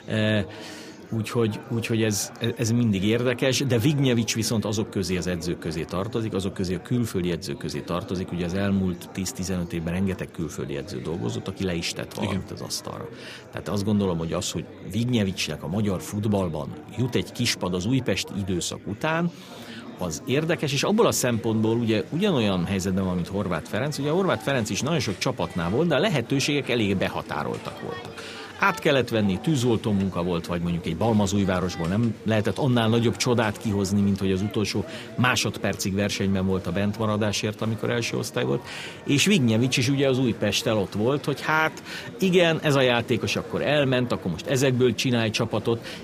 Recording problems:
murmuring crowd; noticeable; throughout; 15 dB below the speech

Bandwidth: 15 kHz